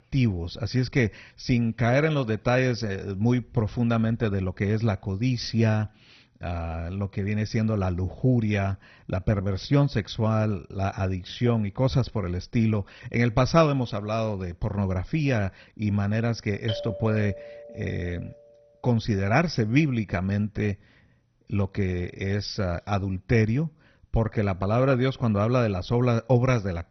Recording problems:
garbled, watery; badly; nothing above 6 kHz
doorbell; noticeable; from 17 to 18 s; peak 8 dB below the speech

